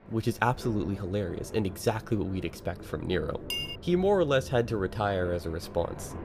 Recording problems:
rain or running water; noticeable; throughout; 15 dB below the speech
clattering dishes; noticeable; at 3.5 s; peak 3 dB below the speech

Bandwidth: 15 kHz